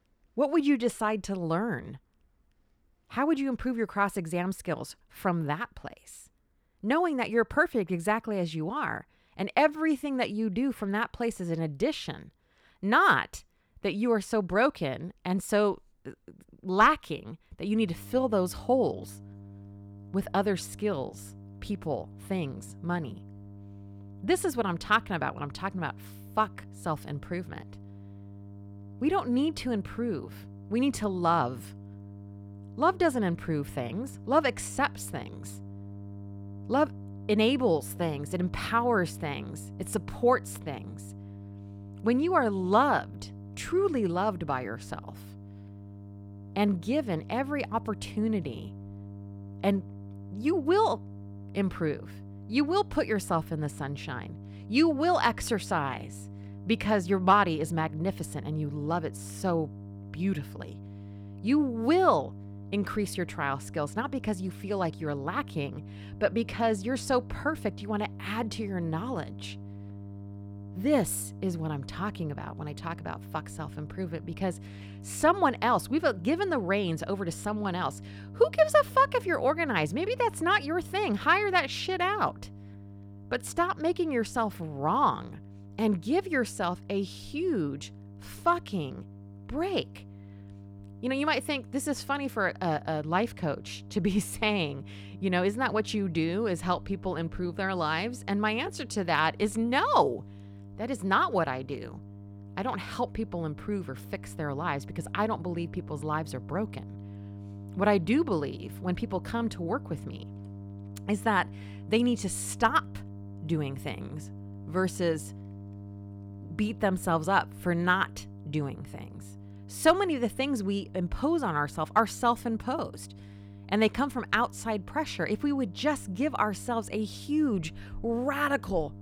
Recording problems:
electrical hum; faint; from 18 s on; 50 Hz, 25 dB below the speech

